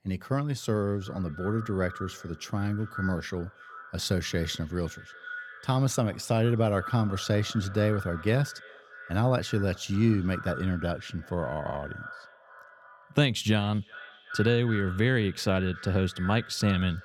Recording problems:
echo of what is said; noticeable; throughout; 370 ms later, 15 dB below the speech

